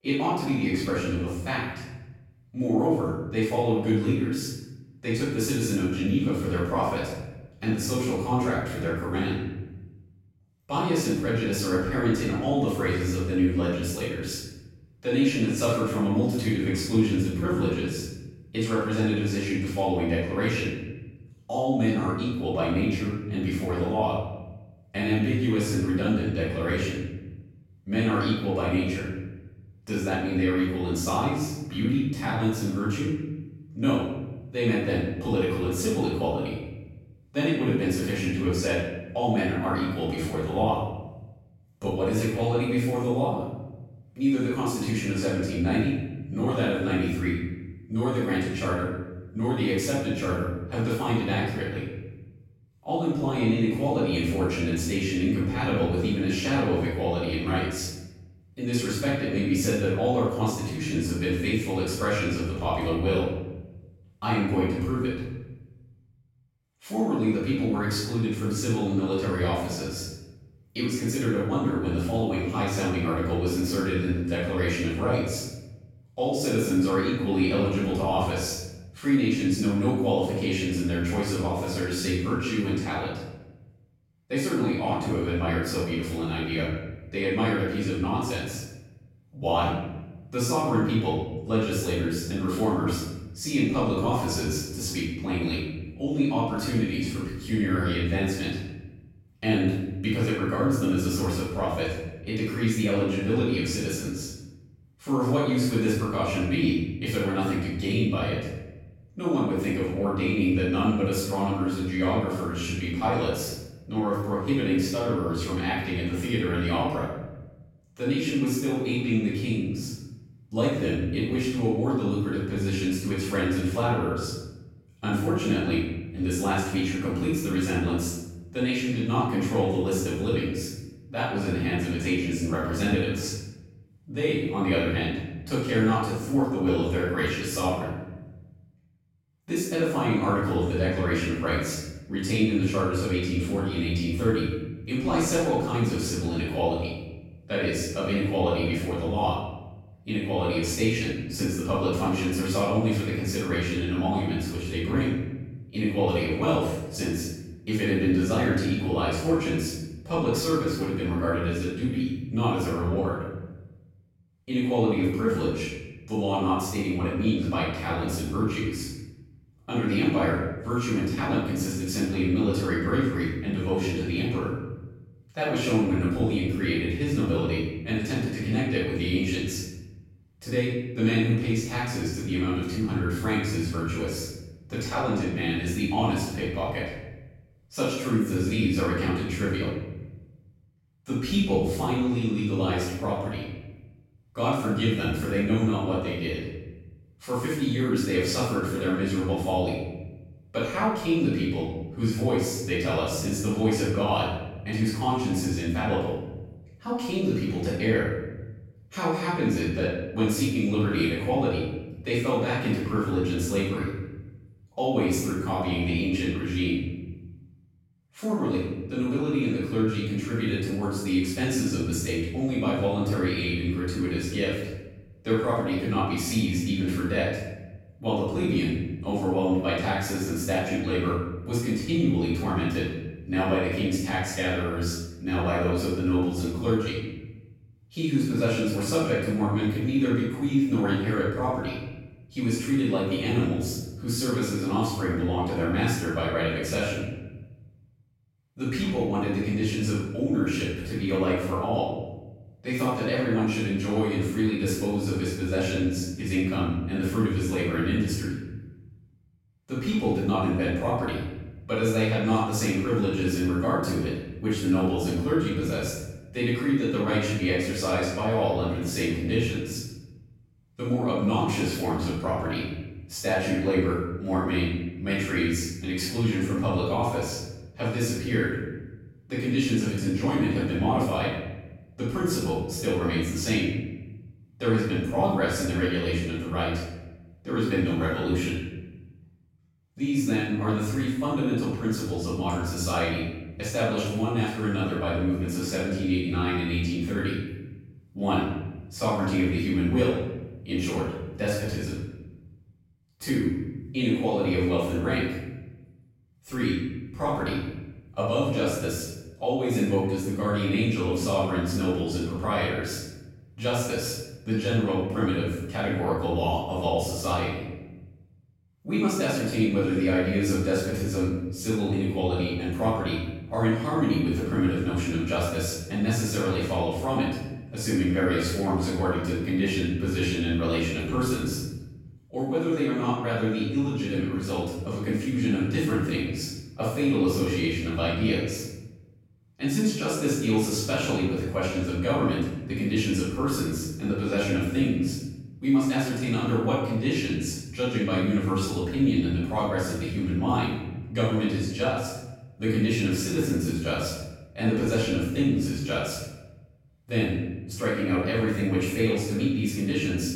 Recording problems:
room echo; strong; dies away in 1.2 s
off-mic speech; far

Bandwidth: 16 kHz